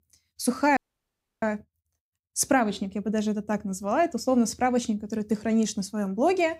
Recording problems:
audio cutting out; at 1 s for 0.5 s

